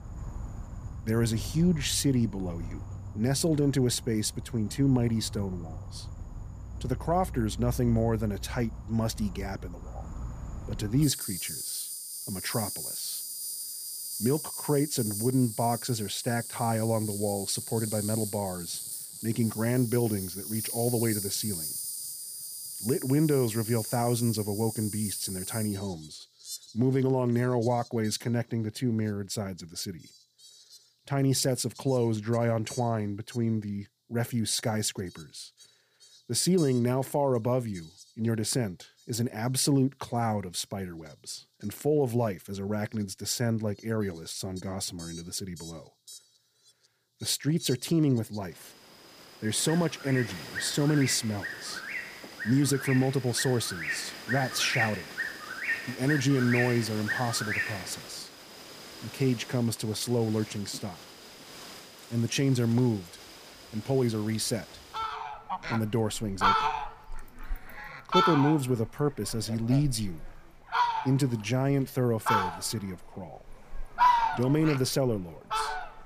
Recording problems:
animal sounds; loud; throughout; 5 dB below the speech

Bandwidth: 15 kHz